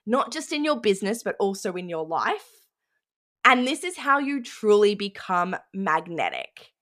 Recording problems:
none

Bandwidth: 14.5 kHz